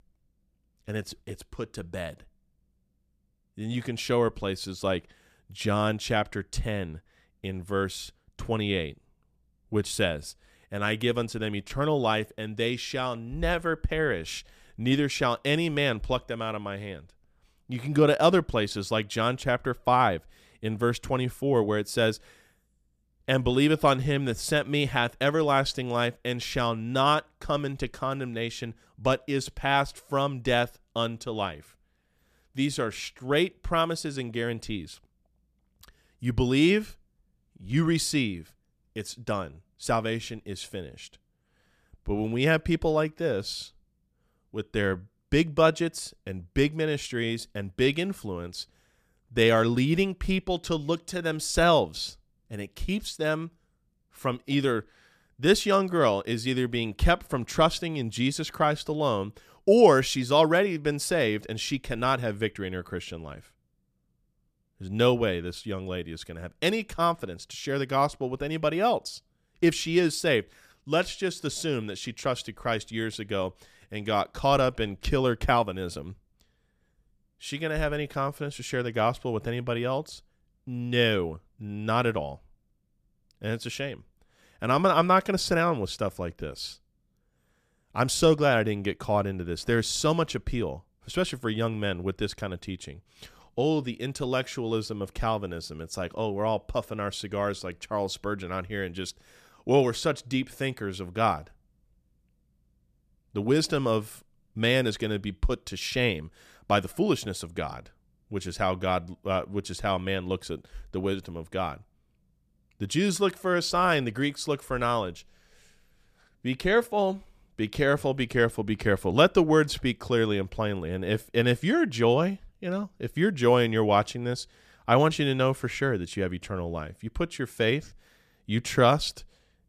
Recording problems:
none

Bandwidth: 14.5 kHz